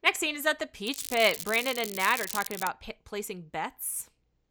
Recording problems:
crackling; loud; from 1 to 2.5 s; 7 dB below the speech

